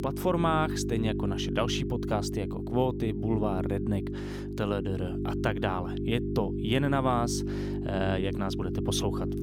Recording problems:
electrical hum; loud; throughout; 50 Hz, 6 dB below the speech

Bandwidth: 17.5 kHz